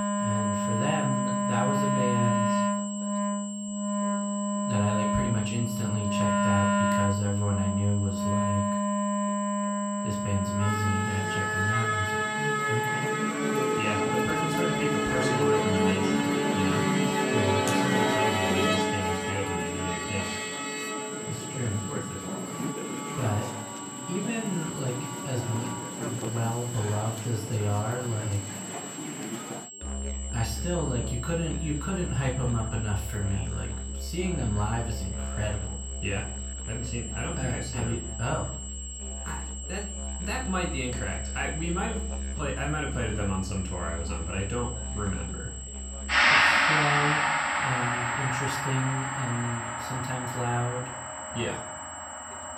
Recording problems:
off-mic speech; far
room echo; slight; dies away in 0.4 s
background music; very loud; throughout; 3 dB above the speech
high-pitched whine; loud; throughout; 7.5 kHz, 7 dB below the speech
voice in the background; faint; throughout; 25 dB below the speech

